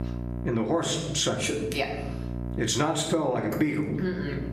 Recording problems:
squashed, flat; heavily
room echo; slight; dies away in 0.6 s
off-mic speech; somewhat distant
electrical hum; noticeable; throughout; 60 Hz, 20 dB below the speech

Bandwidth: 14 kHz